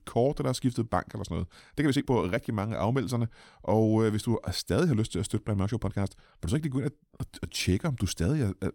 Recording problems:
uneven, jittery; strongly; from 1.5 to 8 s

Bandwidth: 17.5 kHz